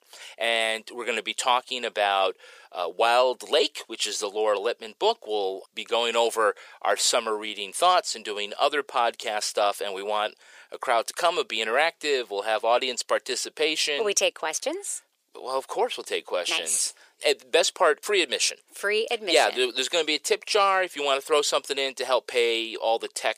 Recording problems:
thin; very; fading below 450 Hz

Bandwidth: 15 kHz